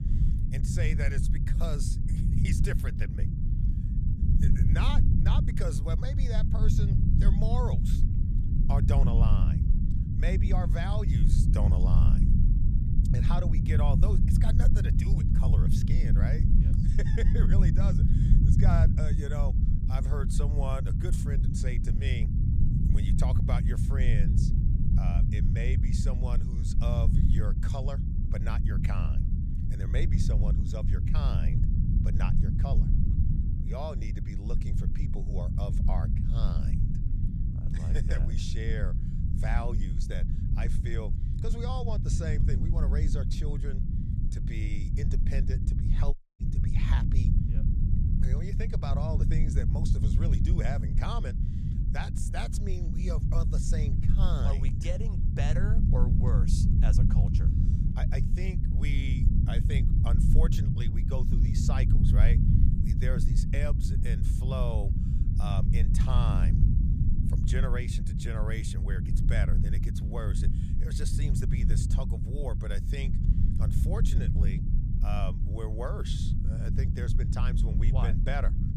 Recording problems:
low rumble; loud; throughout; 1 dB below the speech
audio cutting out; at 46 s

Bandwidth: 15 kHz